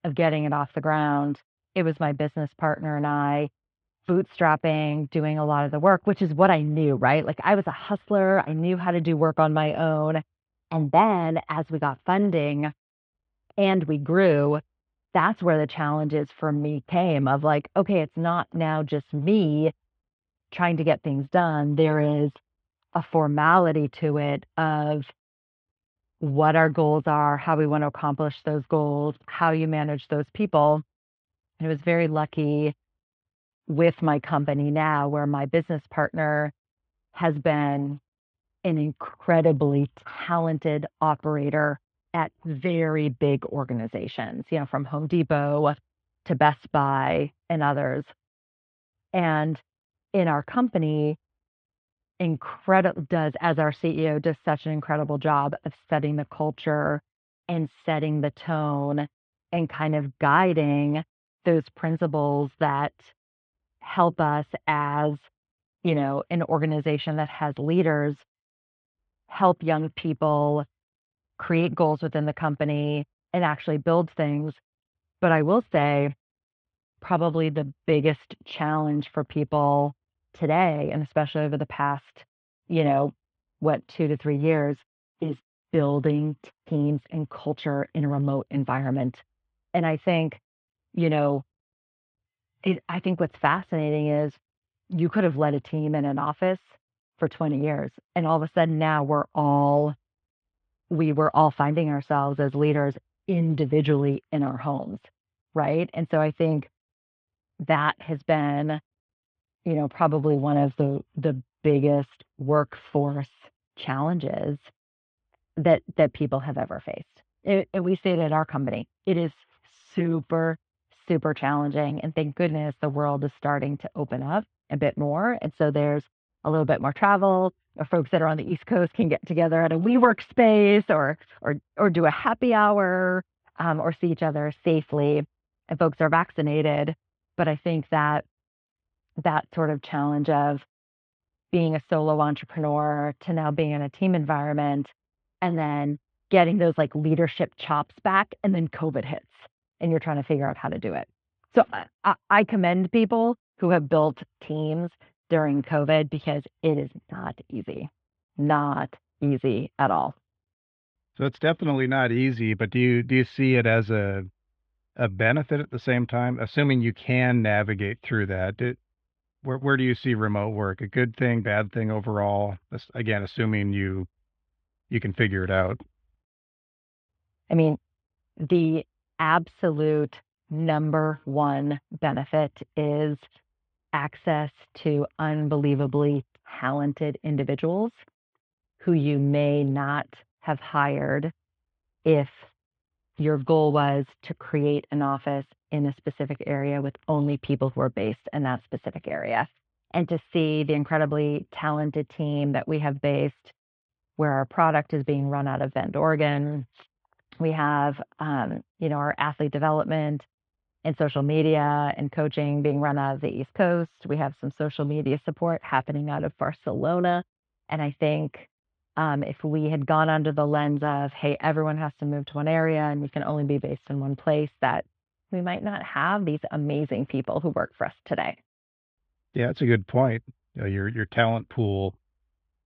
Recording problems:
muffled; very; fading above 3.5 kHz

